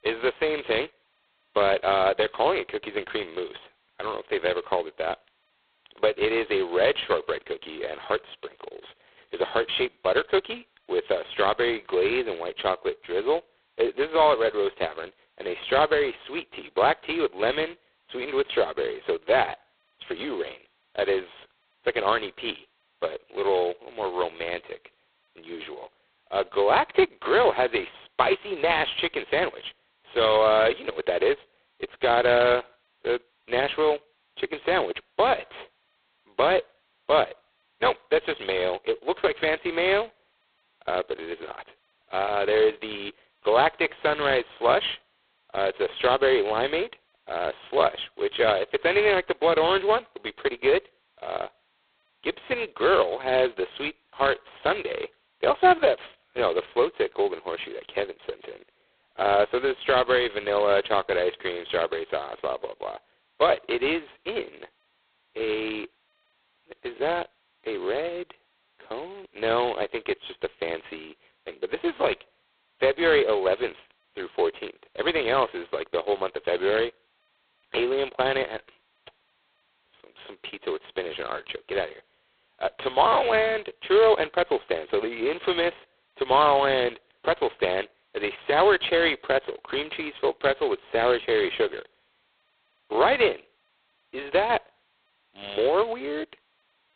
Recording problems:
phone-call audio; poor line; nothing above 4 kHz

